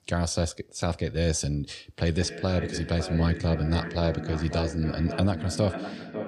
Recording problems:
echo of what is said; strong; from 2 s on; 550 ms later, 8 dB below the speech

